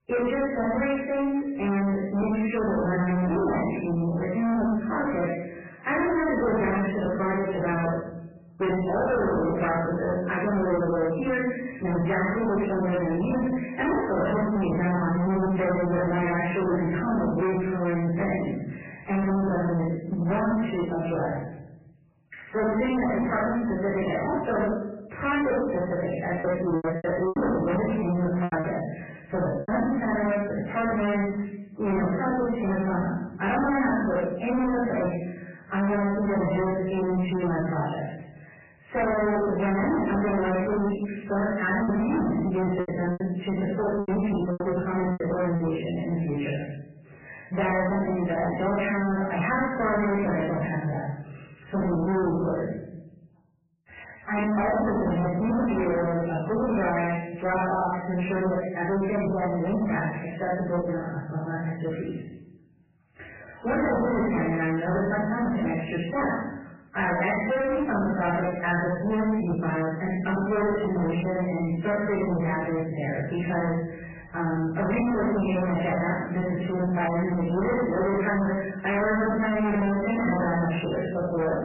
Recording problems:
distortion; heavy; 32% of the sound clipped
off-mic speech; far
garbled, watery; badly; nothing above 3 kHz
room echo; noticeable; dies away in 0.9 s
choppy; very; from 26 to 30 s and from 42 to 46 s; 14% of the speech affected

